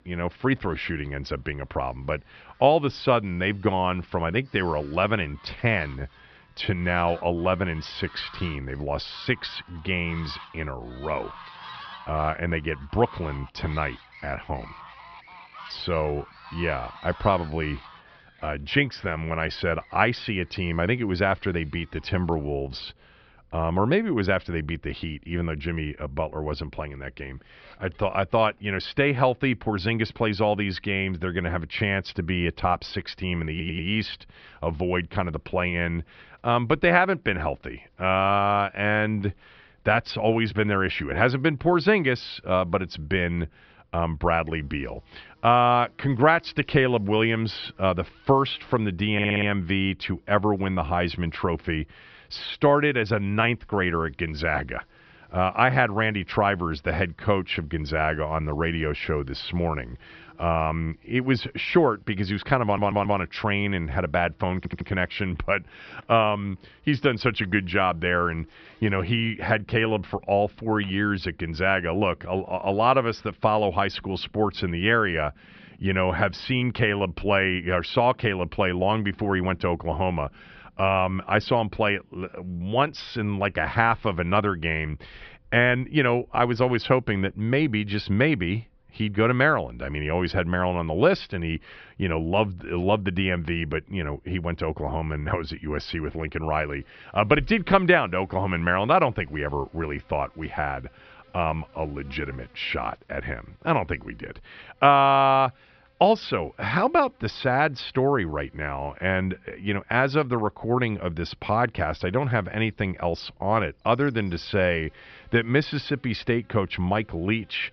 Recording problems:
high frequencies cut off; noticeable; nothing above 5.5 kHz
animal sounds; faint; throughout; 25 dB below the speech
audio stuttering; 4 times, first at 34 s

